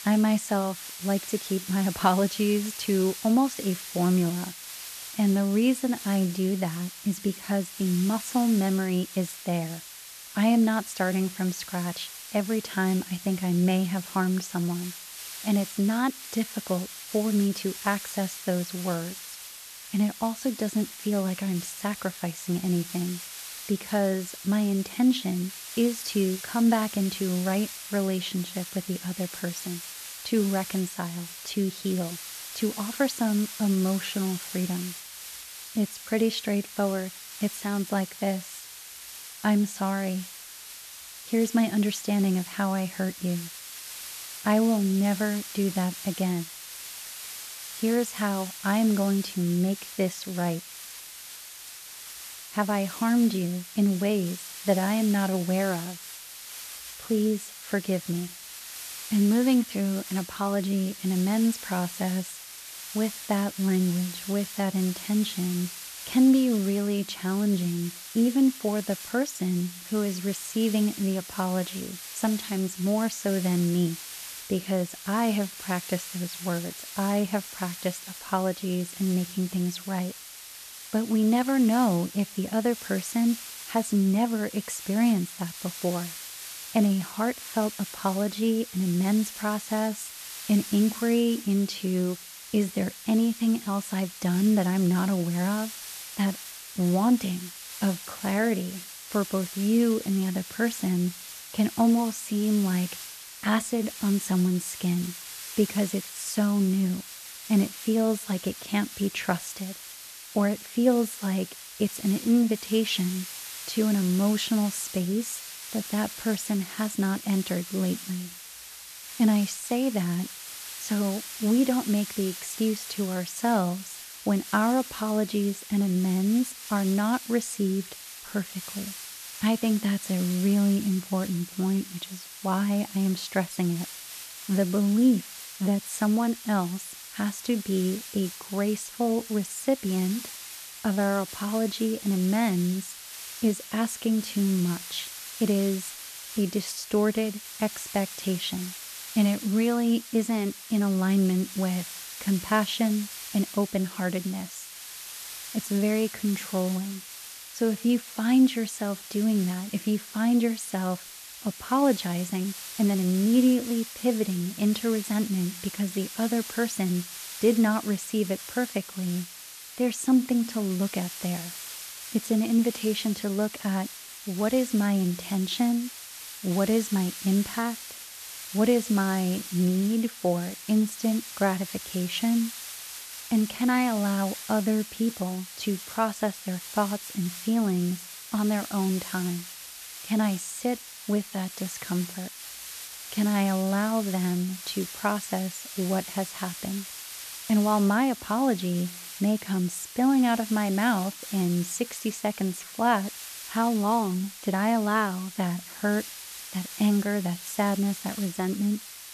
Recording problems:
hiss; noticeable; throughout; 10 dB below the speech

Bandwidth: 14 kHz